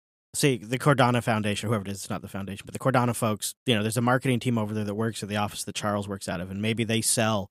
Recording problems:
none

